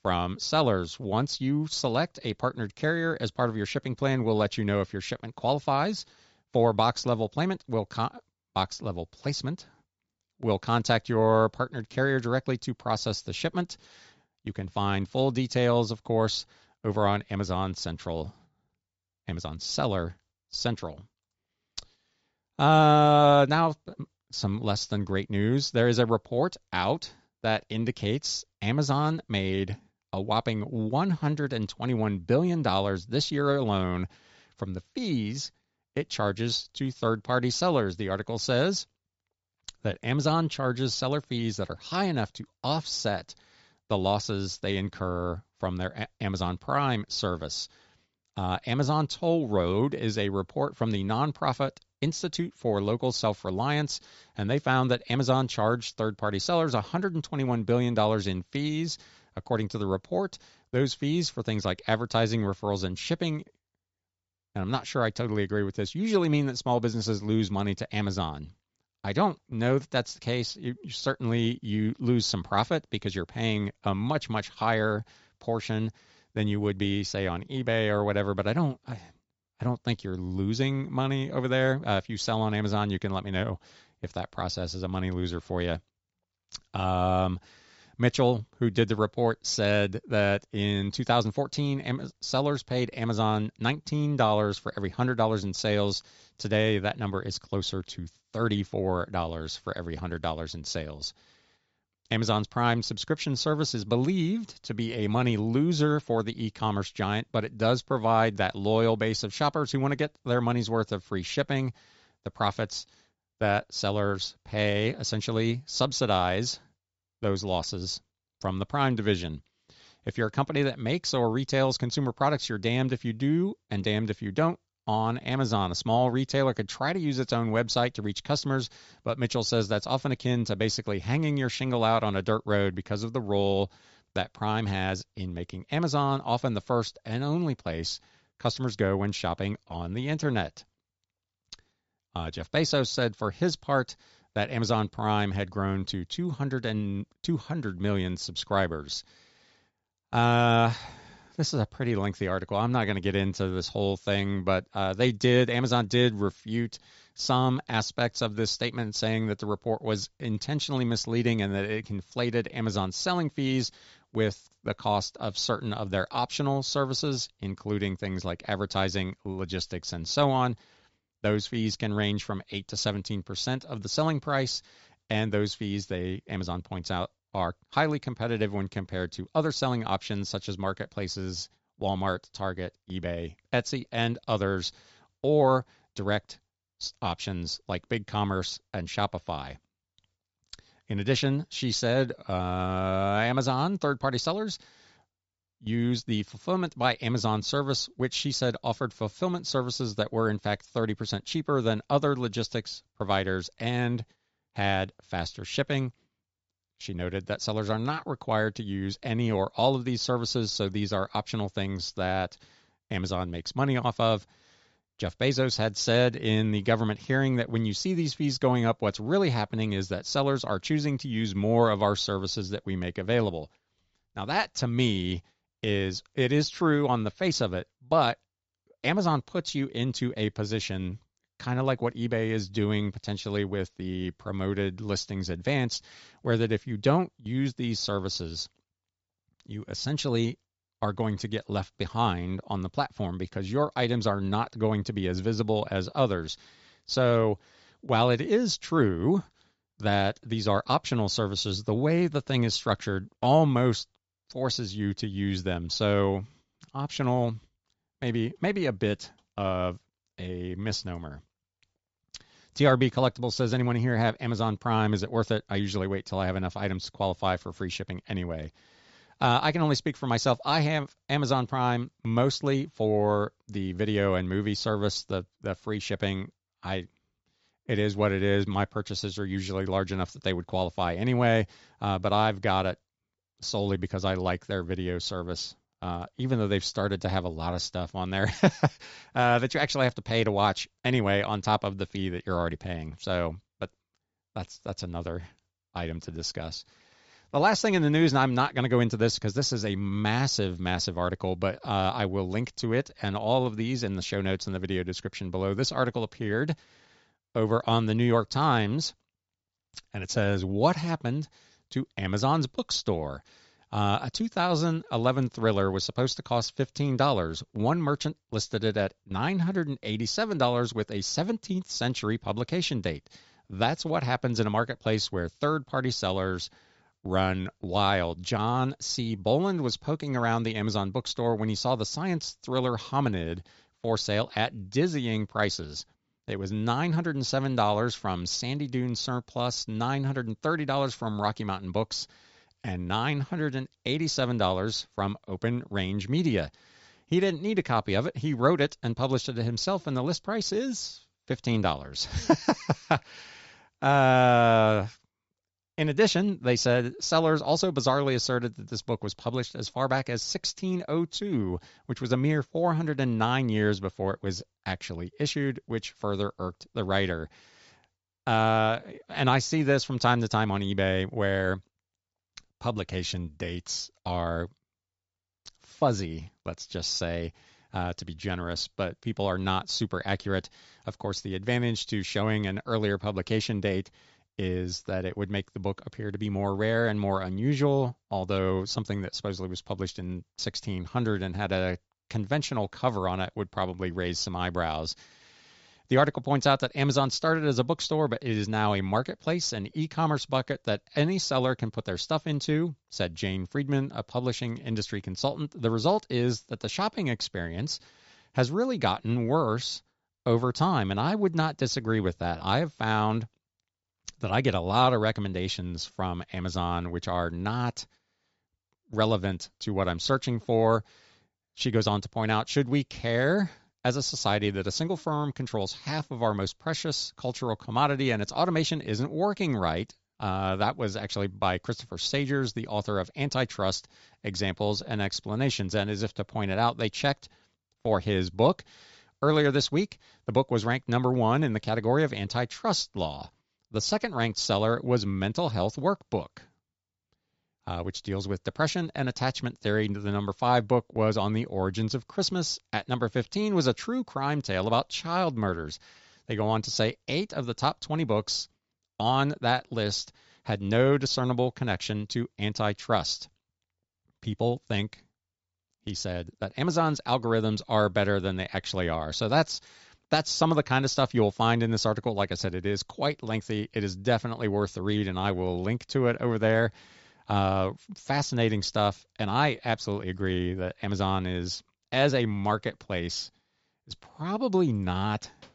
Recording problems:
high frequencies cut off; noticeable; nothing above 8 kHz

